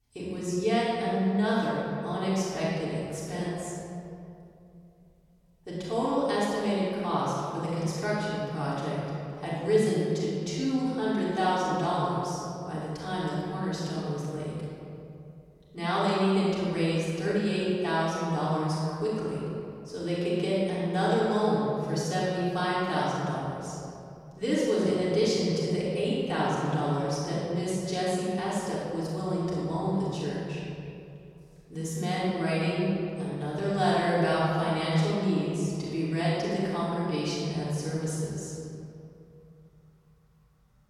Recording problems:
room echo; strong; dies away in 2.5 s
off-mic speech; far

